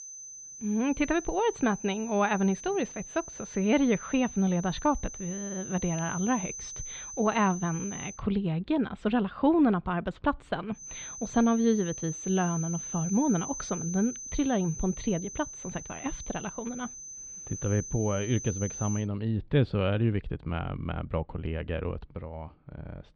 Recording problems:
muffled; slightly; fading above 3.5 kHz
high-pitched whine; loud; until 8 s and from 11 to 19 s; 6 kHz, 9 dB below the speech

